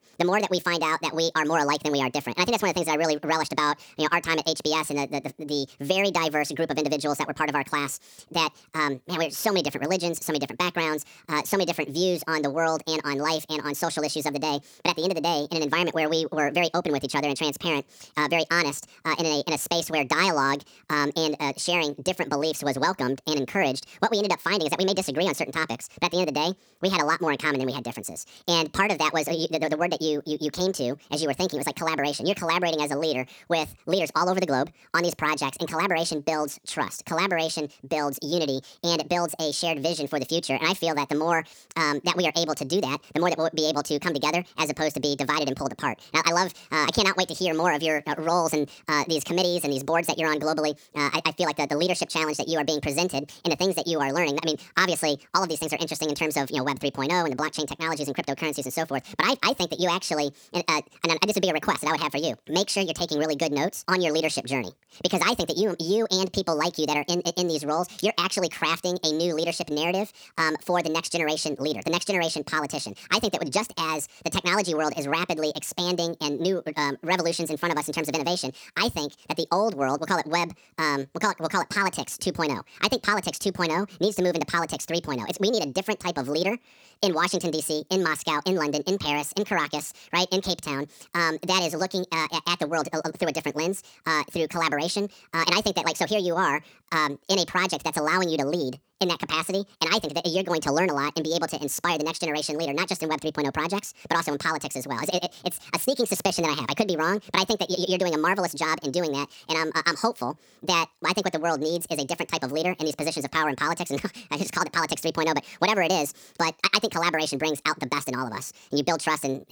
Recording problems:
wrong speed and pitch; too fast and too high; 1.6 times normal speed

